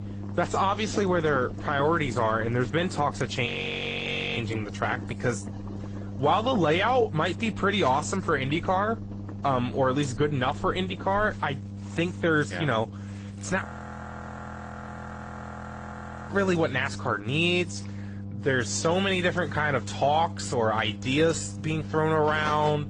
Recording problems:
garbled, watery; slightly; nothing above 8 kHz
household noises; noticeable; throughout; 20 dB below the speech
electrical hum; faint; throughout; 50 Hz, 20 dB below the speech
audio freezing; at 3.5 s for 1 s and at 14 s for 2.5 s

